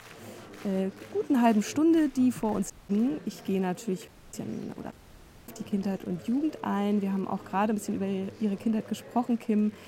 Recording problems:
chatter from many people; noticeable; throughout; 20 dB below the speech
uneven, jittery; strongly; from 0.5 to 8 s
audio cutting out; at 2.5 s, at 4 s and at 5 s for 0.5 s

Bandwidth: 16 kHz